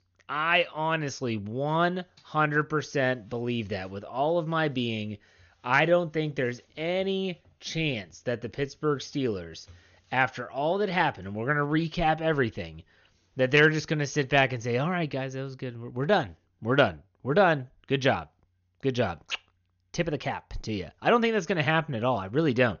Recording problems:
high frequencies cut off; noticeable; nothing above 6.5 kHz

